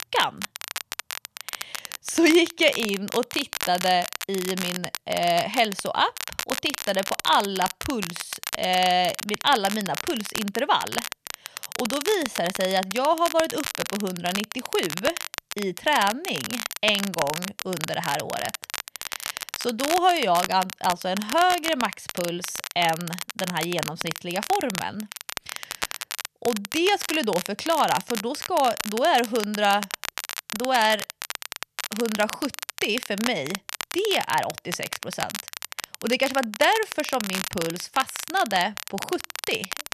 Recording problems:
crackle, like an old record; loud; 7 dB below the speech

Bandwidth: 14 kHz